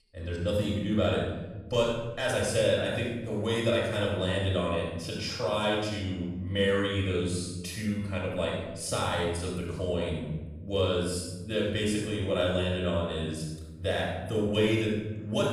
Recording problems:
room echo; strong; dies away in 1.3 s
off-mic speech; far

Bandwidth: 14.5 kHz